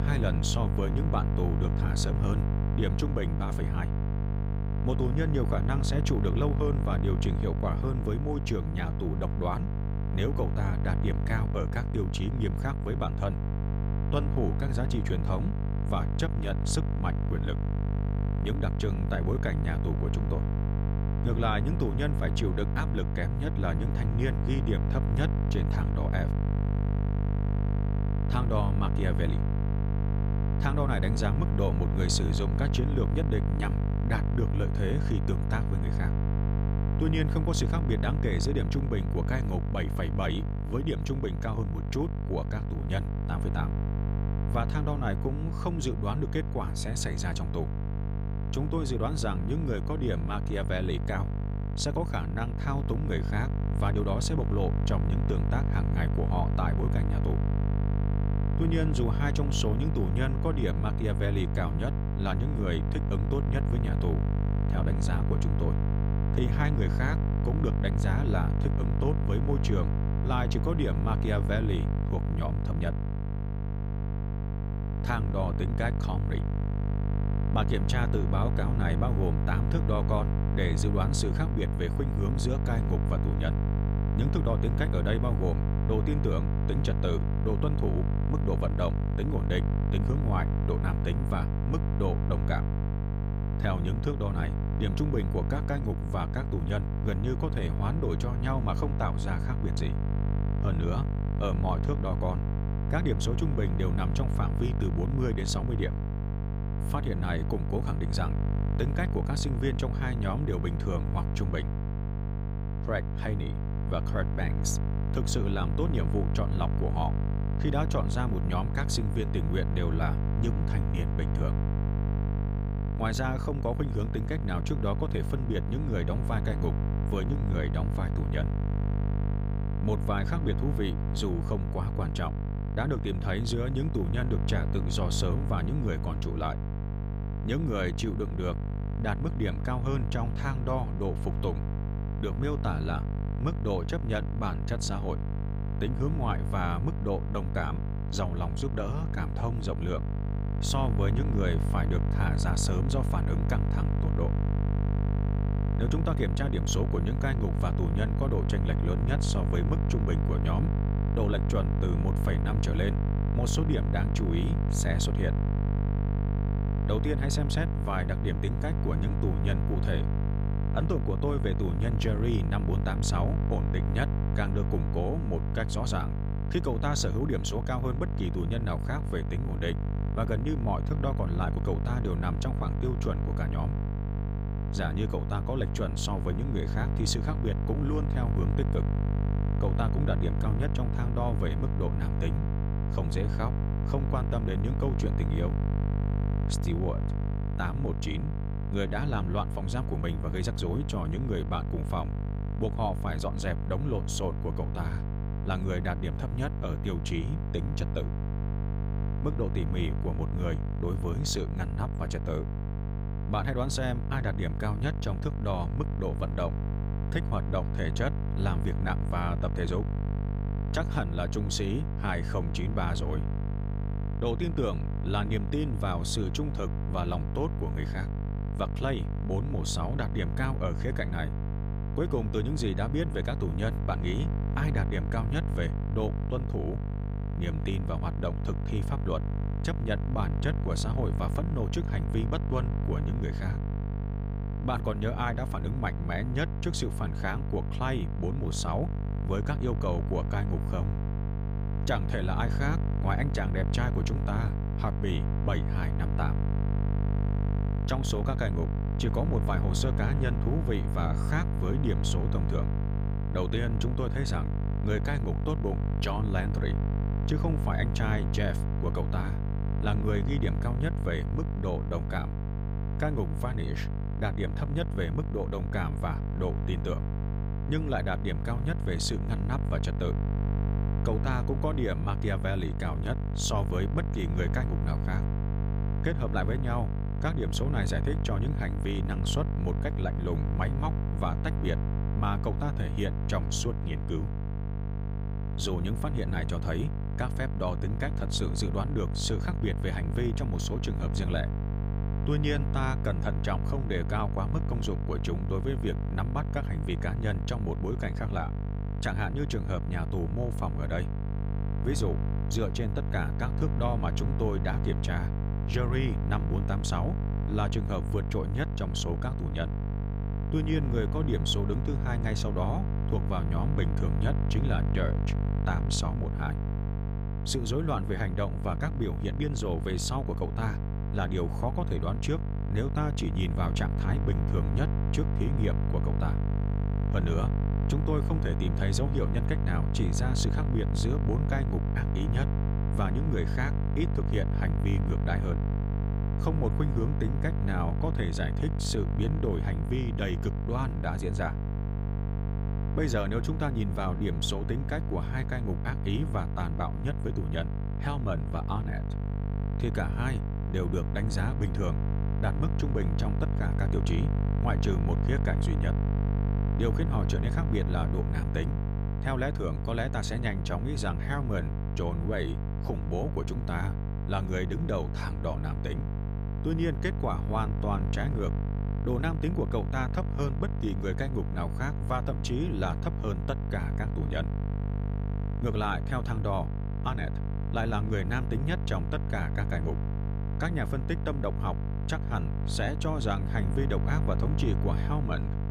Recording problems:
electrical hum; loud; throughout; 50 Hz, 5 dB below the speech

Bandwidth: 15.5 kHz